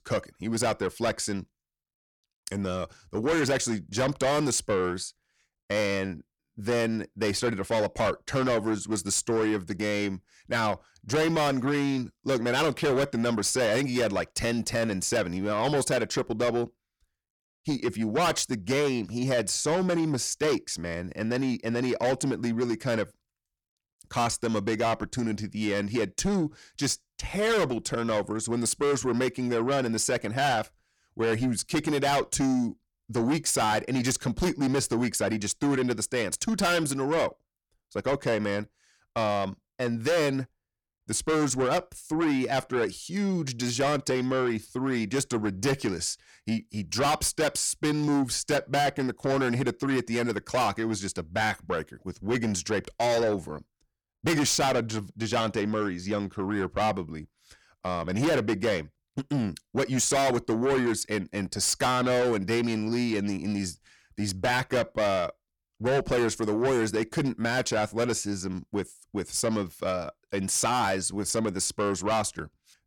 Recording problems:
distortion; heavy; 7 dB below the speech

